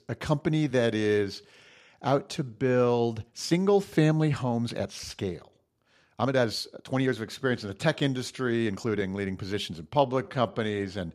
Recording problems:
uneven, jittery; strongly; from 0.5 to 11 s

